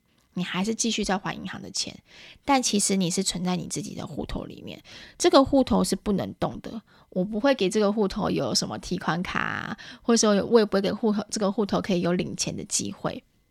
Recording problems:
none

